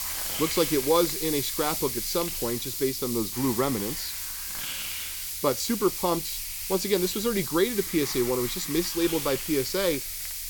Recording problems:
hiss; loud; throughout; 3 dB below the speech

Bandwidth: 18 kHz